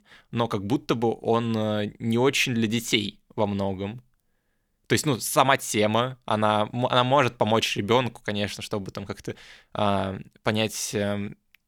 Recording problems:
none

